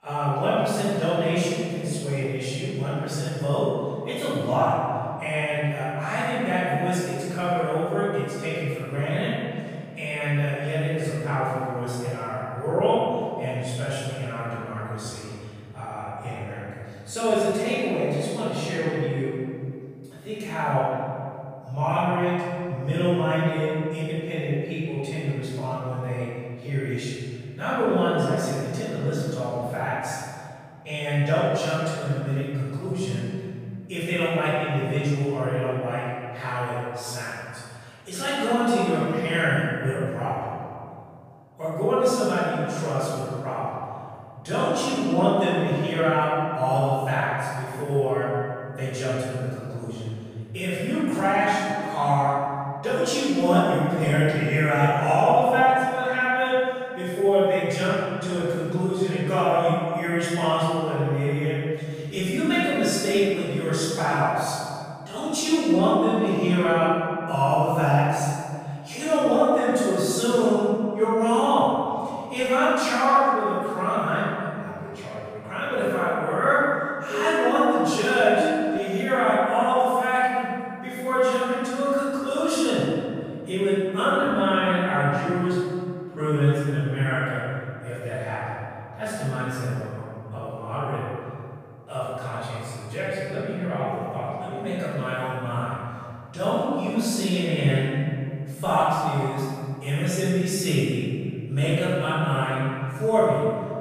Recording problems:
room echo; strong; dies away in 2.2 s
off-mic speech; far
siren; noticeable; from 1:17 to 1:19; peak 3 dB below the speech

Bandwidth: 15 kHz